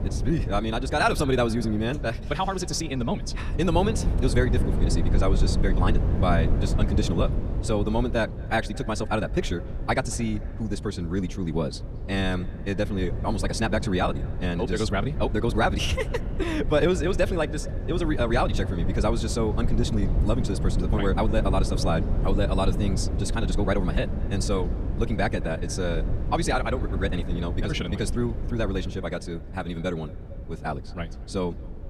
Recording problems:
wrong speed, natural pitch; too fast; 1.8 times normal speed
echo of what is said; faint; throughout; 220 ms later, 20 dB below the speech
wind noise on the microphone; occasional gusts; 10 dB below the speech

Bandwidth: 14.5 kHz